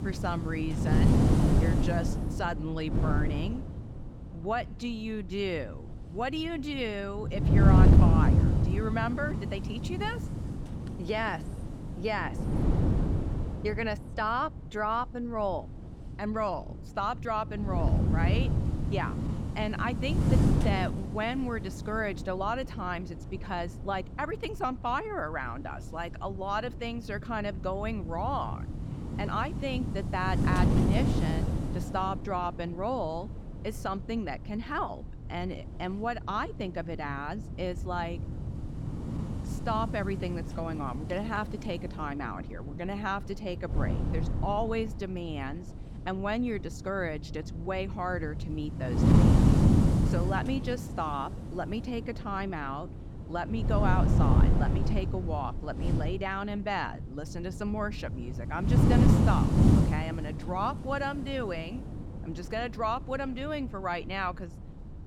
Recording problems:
wind noise on the microphone; heavy; 4 dB below the speech

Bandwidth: 17.5 kHz